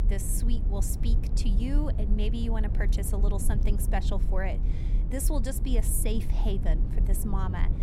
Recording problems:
low rumble; loud; throughout; 8 dB below the speech

